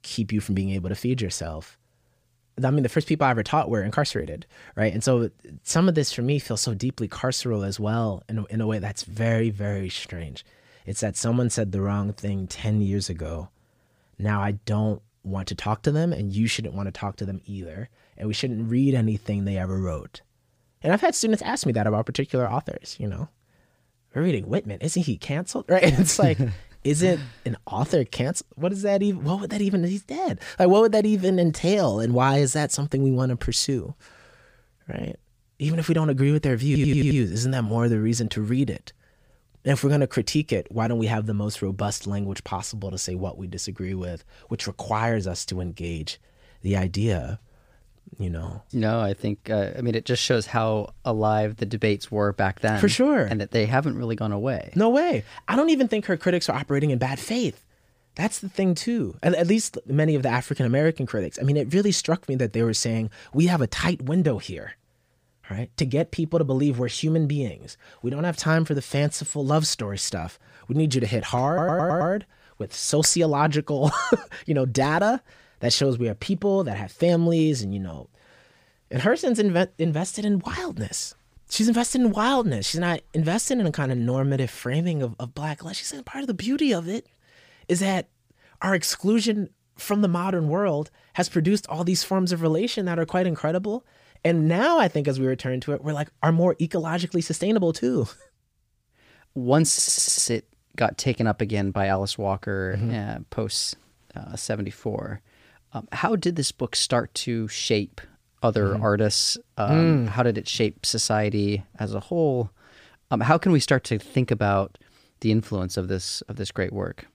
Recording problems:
audio stuttering; at 37 s, at 1:11 and at 1:40

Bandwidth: 15 kHz